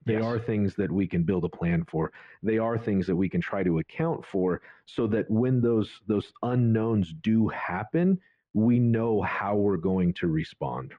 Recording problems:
muffled; very; fading above 2.5 kHz

